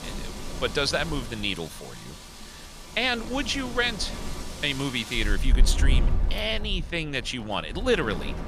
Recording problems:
wind in the background; loud; throughout; 5 dB below the speech

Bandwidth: 15 kHz